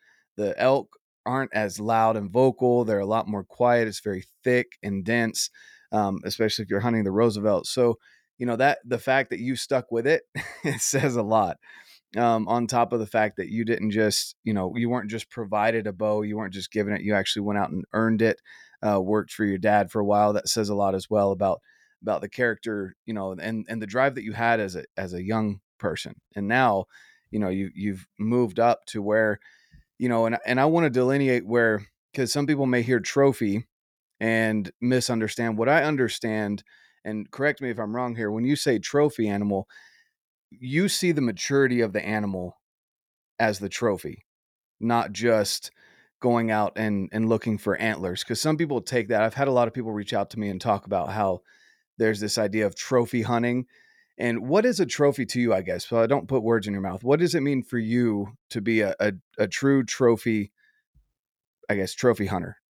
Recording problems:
none

